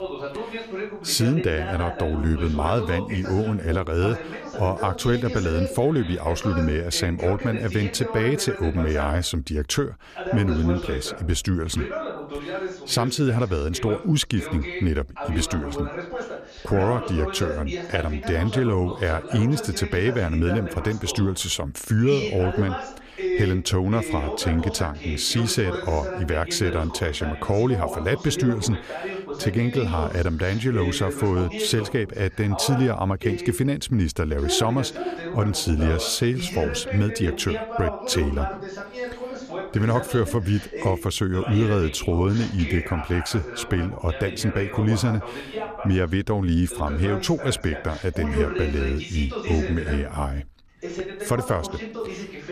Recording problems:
voice in the background; loud; throughout; 8 dB below the speech

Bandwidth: 14.5 kHz